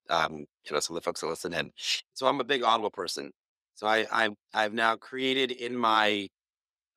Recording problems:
thin; somewhat; fading below 400 Hz

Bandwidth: 15.5 kHz